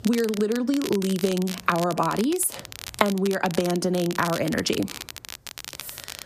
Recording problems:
squashed, flat; somewhat
crackle, like an old record; noticeable; 10 dB below the speech

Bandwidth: 14.5 kHz